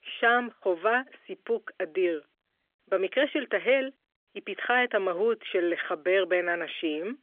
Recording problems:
phone-call audio; nothing above 3.5 kHz

